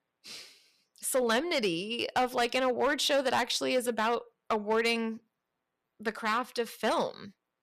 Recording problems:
distortion; slight; 4% of the sound clipped

